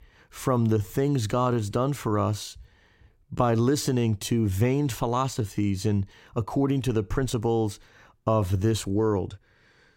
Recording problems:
uneven, jittery; strongly; from 0.5 to 9.5 s

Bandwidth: 16 kHz